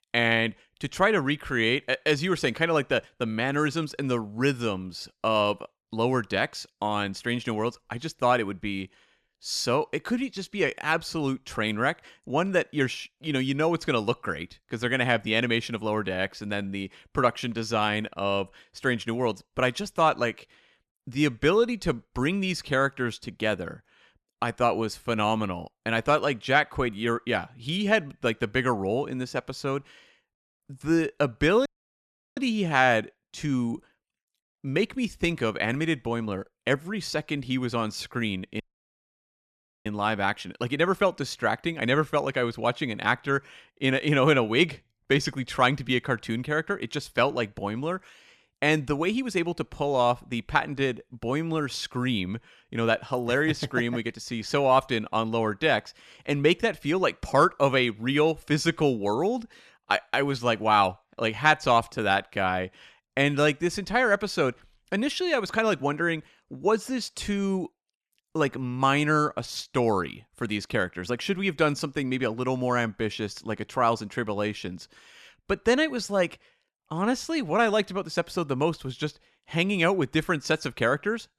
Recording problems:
audio cutting out; at 32 s for 0.5 s and at 39 s for 1.5 s

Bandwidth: 14 kHz